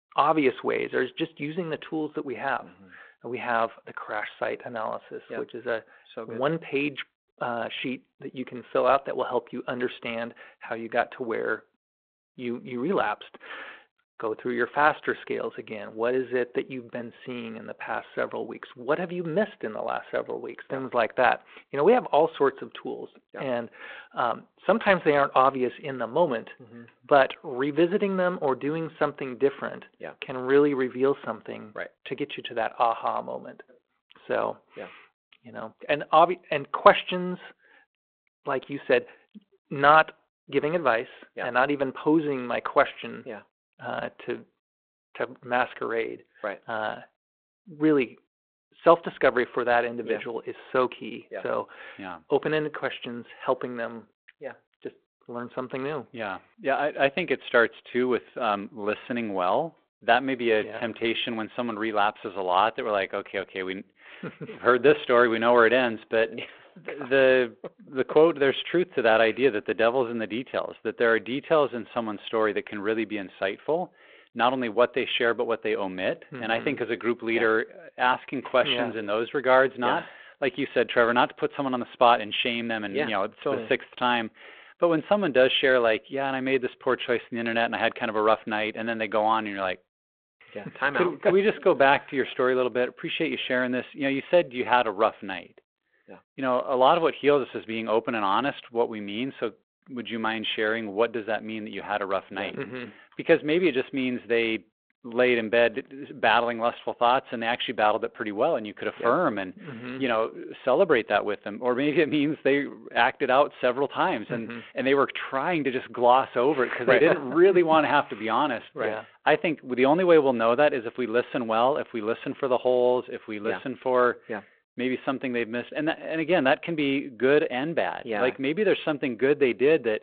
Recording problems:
phone-call audio

